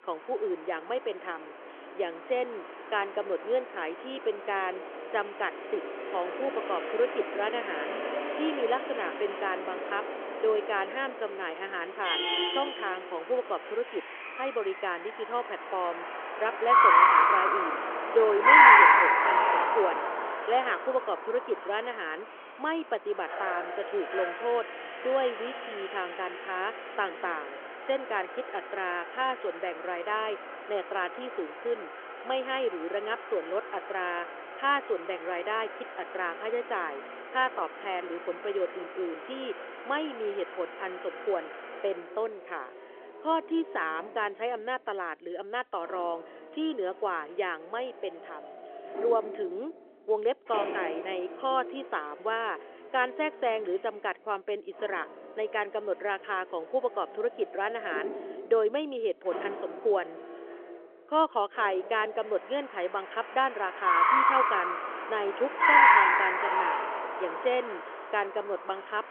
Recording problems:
phone-call audio
traffic noise; very loud; throughout; 7 dB above the speech

